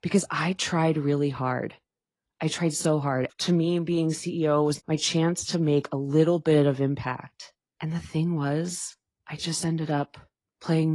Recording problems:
garbled, watery; slightly; nothing above 10.5 kHz
abrupt cut into speech; at the end

